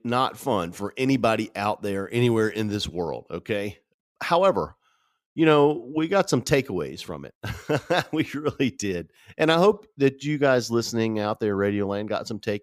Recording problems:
none

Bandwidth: 15 kHz